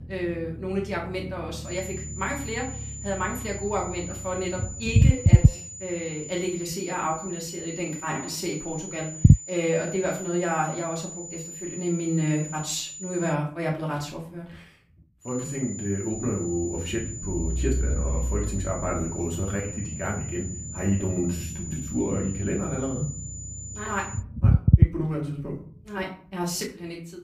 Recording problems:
off-mic speech; far
room echo; slight; dies away in 0.4 s
high-pitched whine; loud; from 1.5 to 13 s and from 15 to 24 s; 7 kHz, 7 dB below the speech
low rumble; loud; throughout; 7 dB below the speech
uneven, jittery; strongly; from 4.5 to 27 s

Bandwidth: 15 kHz